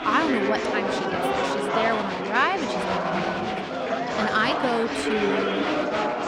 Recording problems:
murmuring crowd; very loud; throughout; 1 dB above the speech

